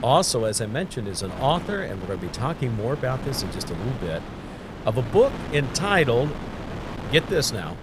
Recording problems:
wind noise on the microphone; occasional gusts; 10 dB below the speech

